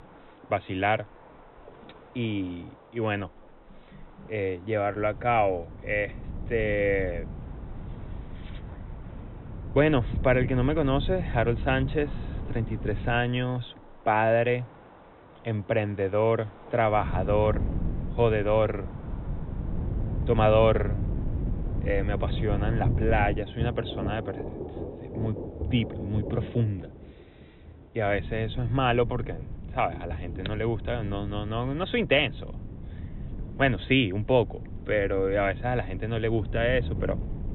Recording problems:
high frequencies cut off; severe; nothing above 4 kHz
rain or running water; noticeable; throughout; 15 dB below the speech
wind noise on the microphone; occasional gusts; from 5 to 13 s, from 17 to 23 s and from 28 s on; 20 dB below the speech

